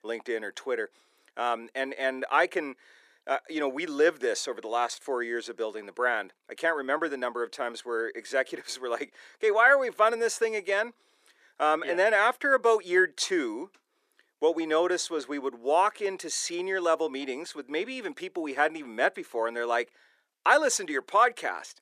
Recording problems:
thin; somewhat; fading below 300 Hz

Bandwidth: 14.5 kHz